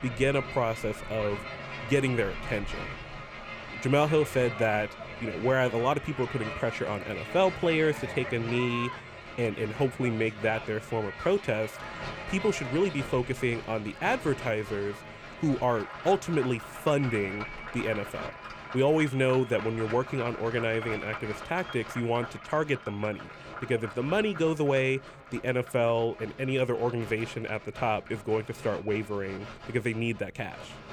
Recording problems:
crowd noise; noticeable; throughout; 10 dB below the speech

